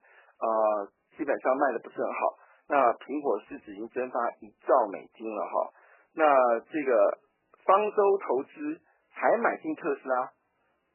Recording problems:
garbled, watery; badly
phone-call audio; nothing above 2.5 kHz

